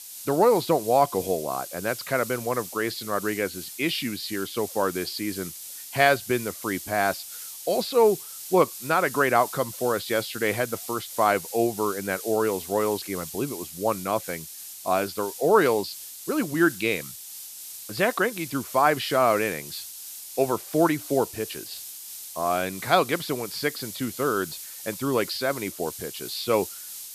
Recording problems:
high frequencies cut off; noticeable; nothing above 5.5 kHz
hiss; noticeable; throughout; 10 dB below the speech

